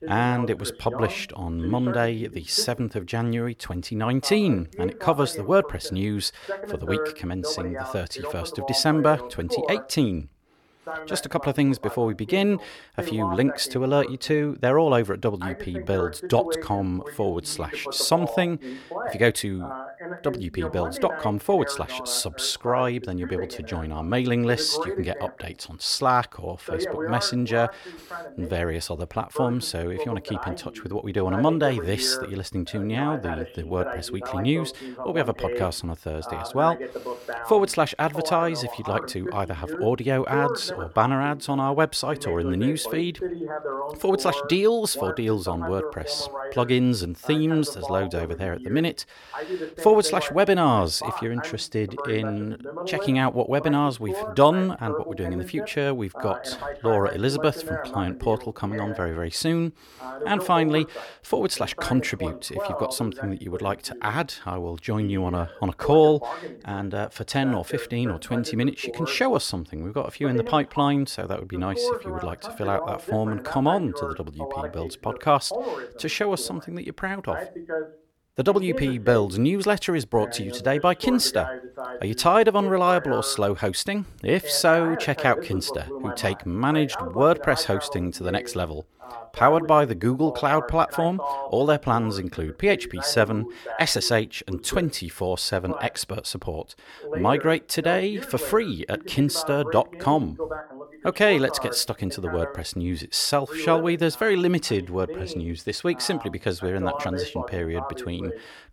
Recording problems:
voice in the background; loud; throughout; 10 dB below the speech

